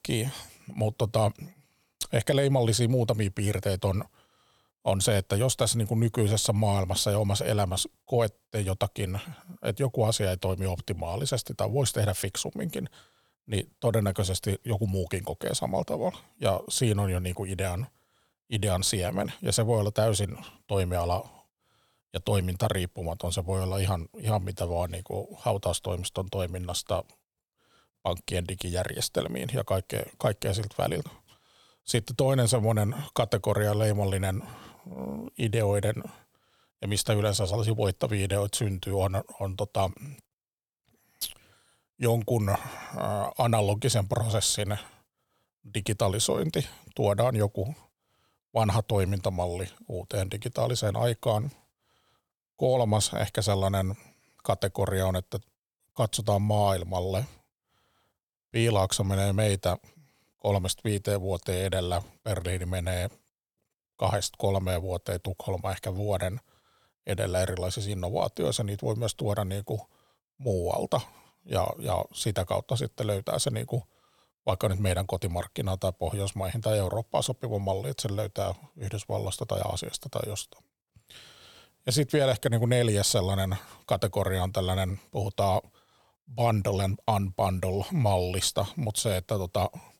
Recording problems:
none

